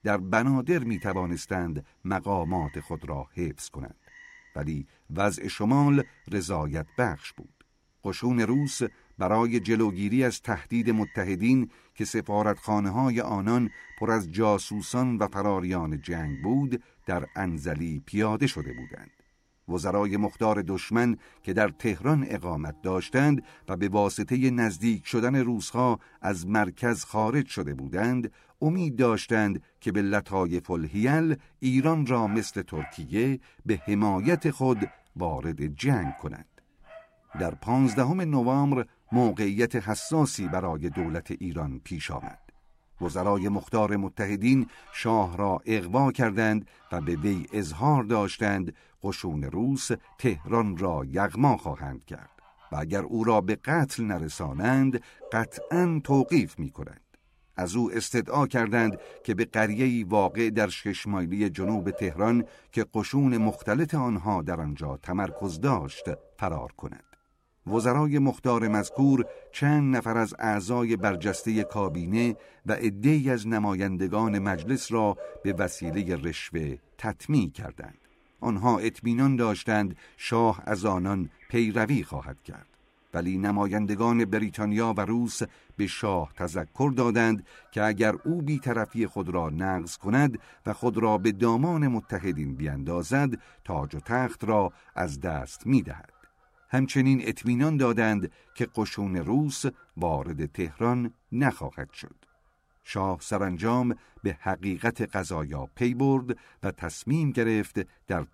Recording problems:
animal sounds; faint; throughout; 20 dB below the speech

